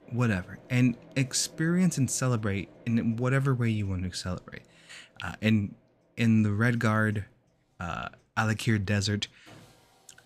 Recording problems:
machinery noise; faint; throughout; 25 dB below the speech

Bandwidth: 14.5 kHz